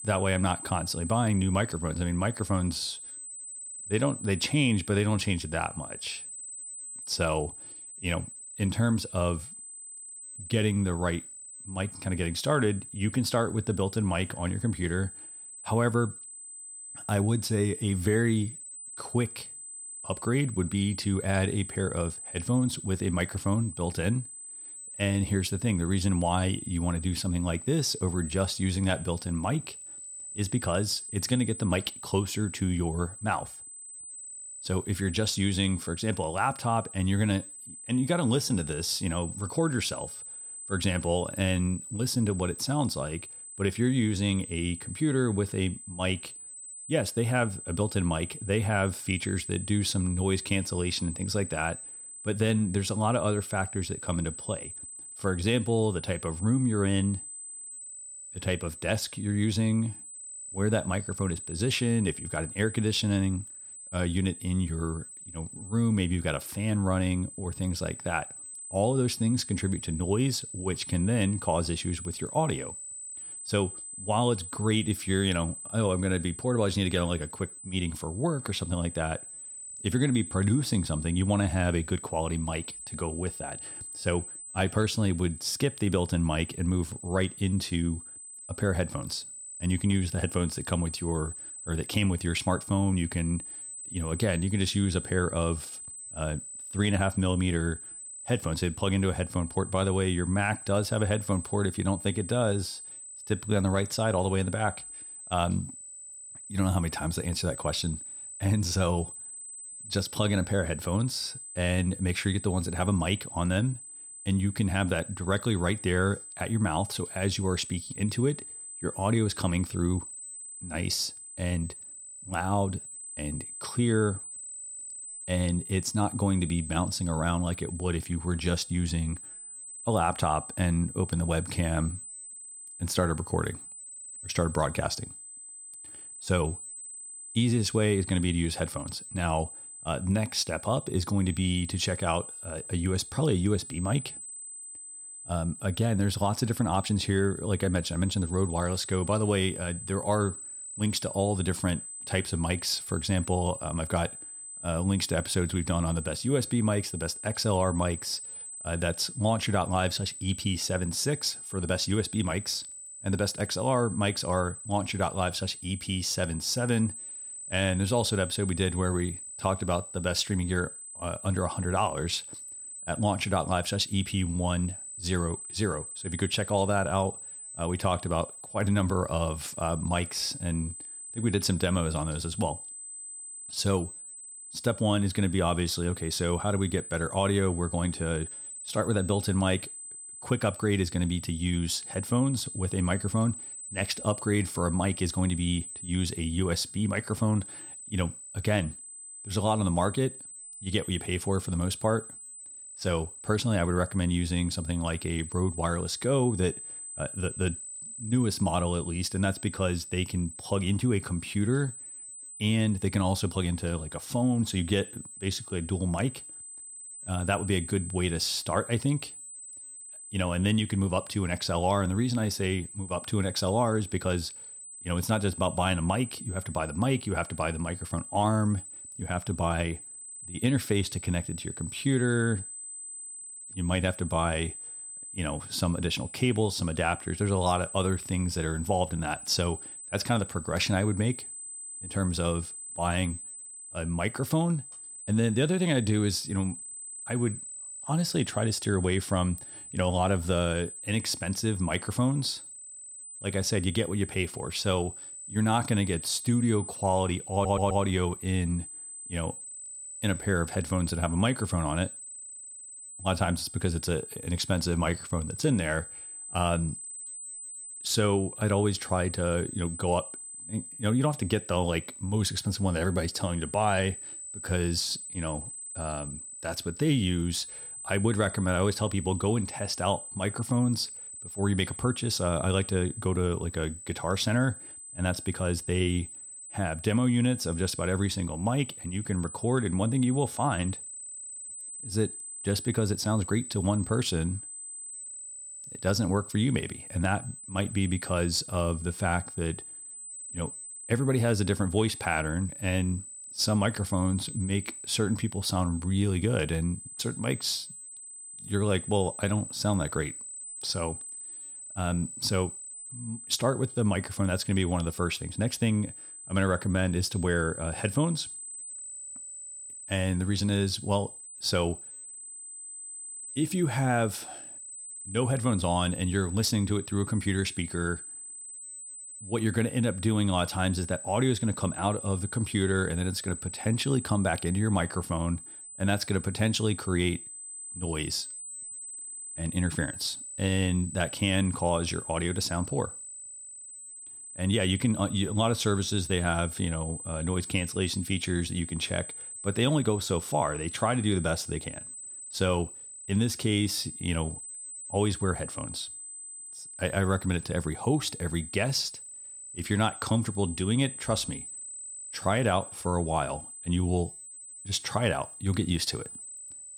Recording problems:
high-pitched whine; noticeable; throughout; 8 kHz, 10 dB below the speech
audio stuttering; at 4:17

